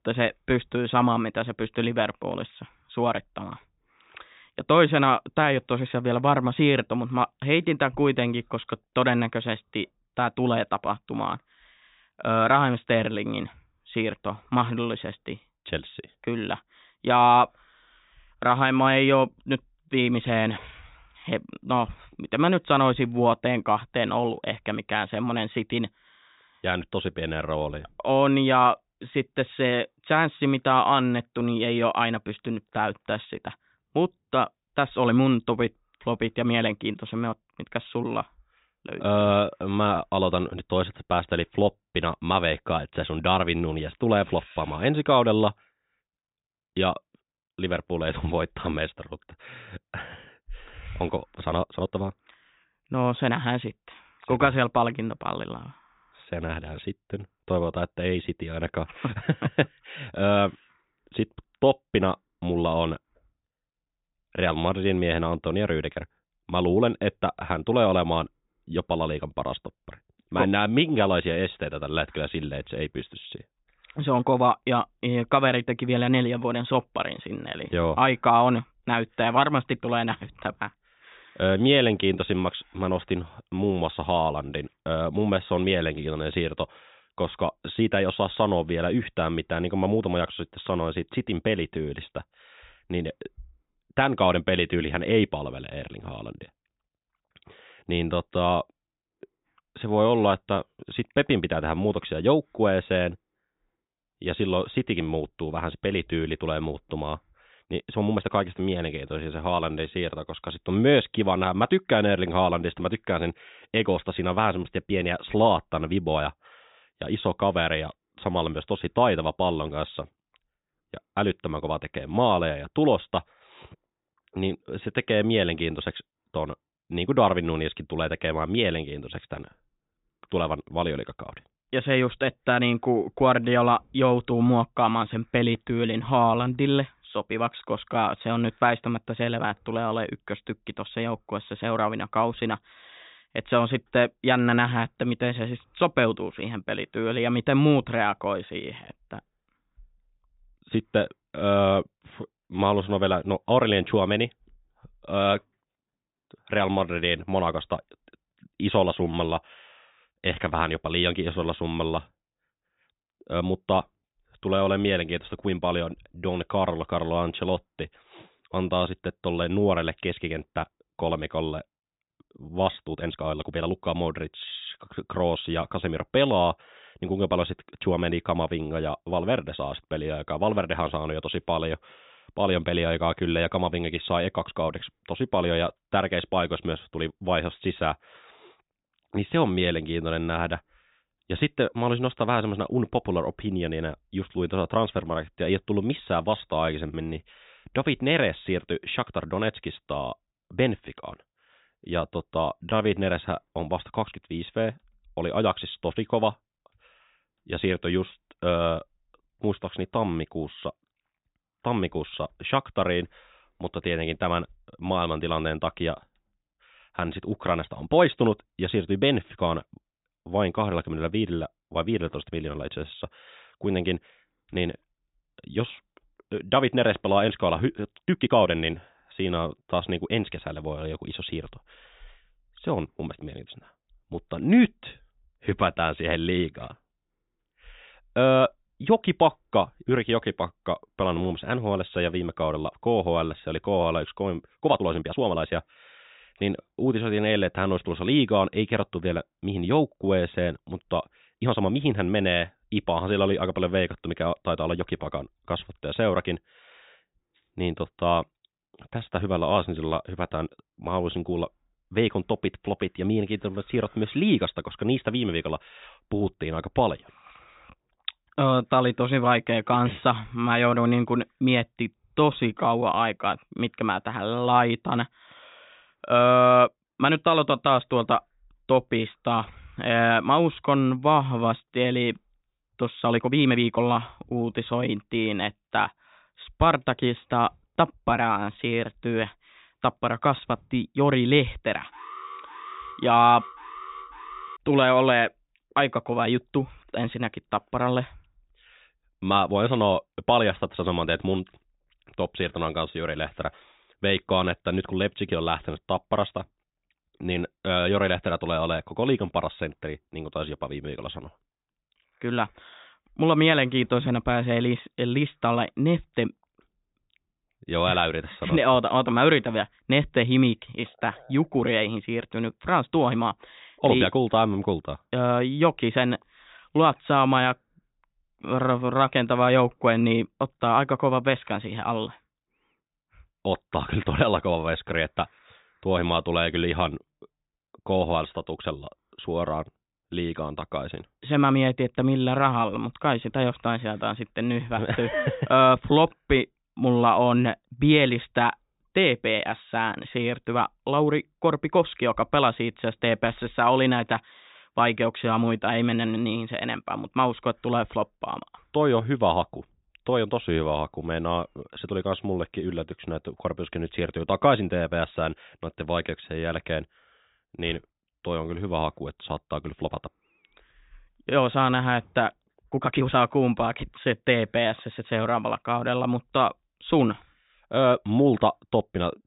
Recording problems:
high frequencies cut off; severe; nothing above 4 kHz
uneven, jittery; strongly; from 51 s to 6:13
alarm; faint; from 4:52 to 4:55; peak 15 dB below the speech

